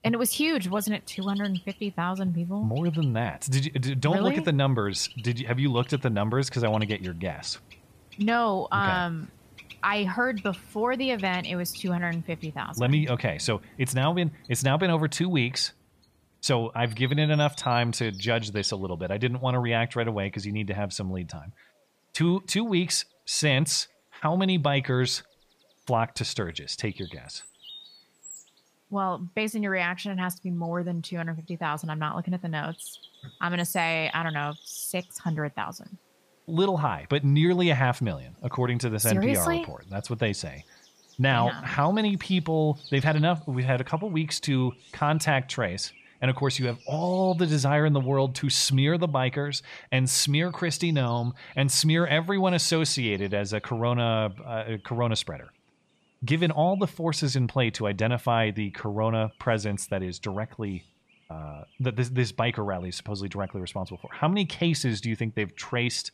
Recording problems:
animal sounds; faint; throughout; 20 dB below the speech

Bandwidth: 15 kHz